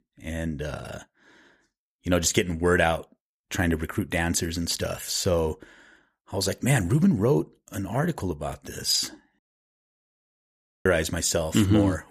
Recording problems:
audio cutting out; at 9.5 s for 1.5 s

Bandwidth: 15 kHz